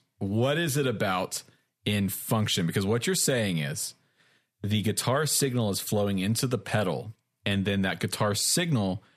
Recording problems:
none

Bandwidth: 14.5 kHz